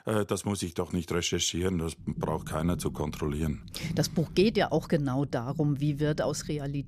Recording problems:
low rumble; noticeable; from 2 s on; 20 dB below the speech

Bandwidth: 14.5 kHz